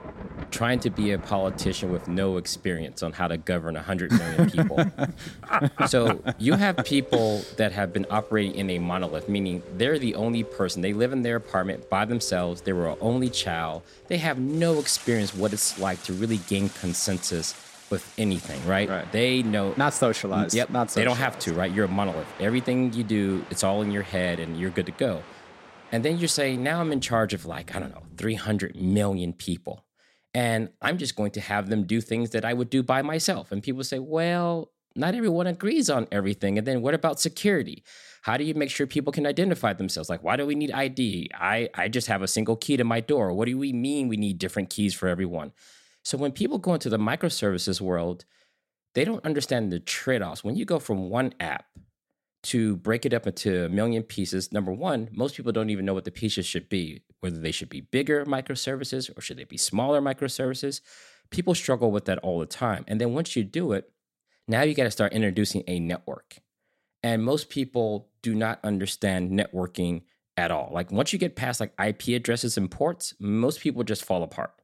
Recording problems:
rain or running water; noticeable; until 28 s; 15 dB below the speech

